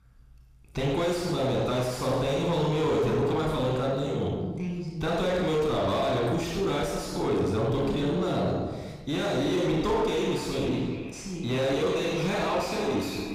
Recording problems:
distortion; heavy; 7 dB below the speech
echo of what is said; noticeable; from 10 s on; 420 ms later, 15 dB below the speech
room echo; noticeable; dies away in 0.9 s
off-mic speech; somewhat distant

